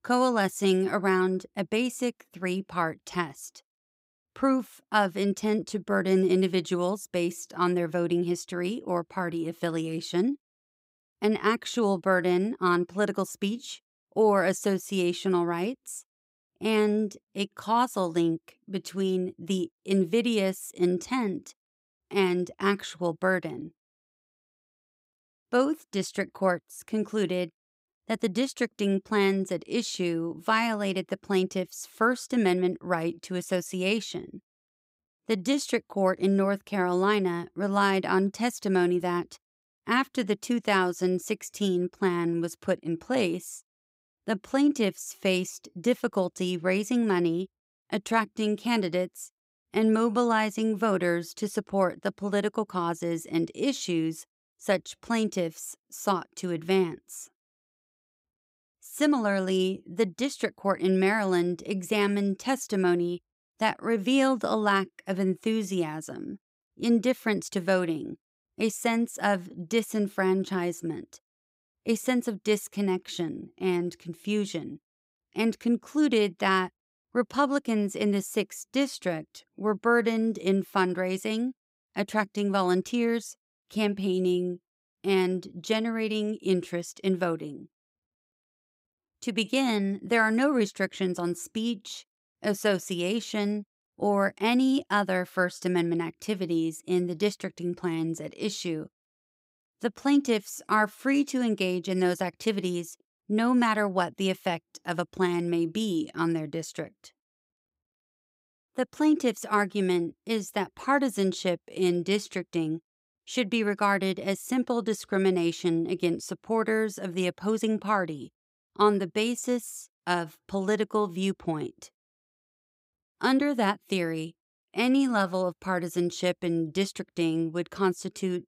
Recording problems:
none

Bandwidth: 15.5 kHz